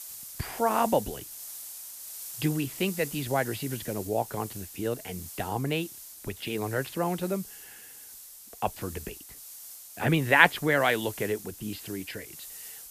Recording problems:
high frequencies cut off; noticeable; nothing above 5 kHz
hiss; noticeable; throughout; 10 dB below the speech

